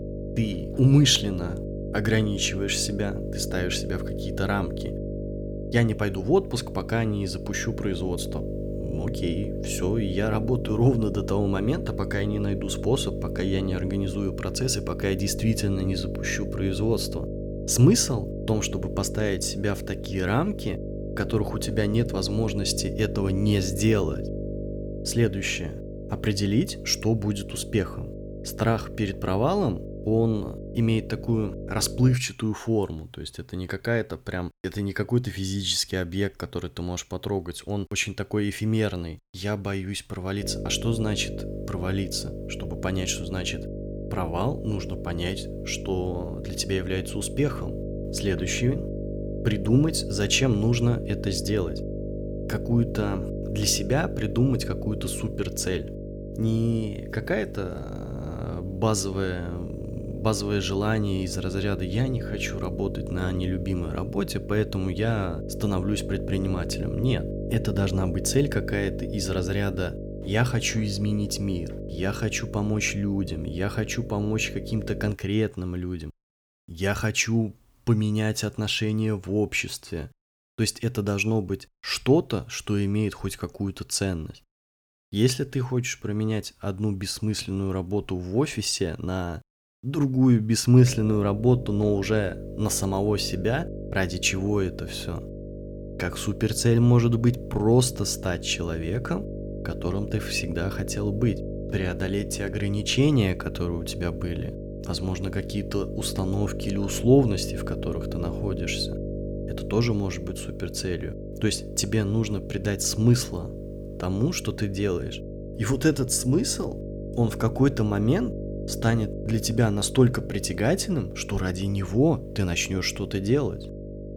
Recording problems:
electrical hum; loud; until 32 s, from 40 s to 1:15 and from 1:31 on; 50 Hz, 9 dB below the speech

